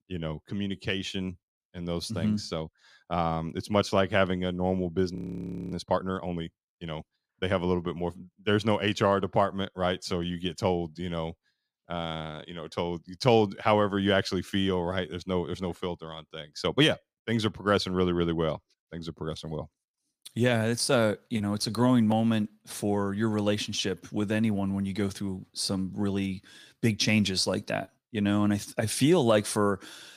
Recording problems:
audio freezing; at 5 s for 0.5 s

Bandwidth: 15 kHz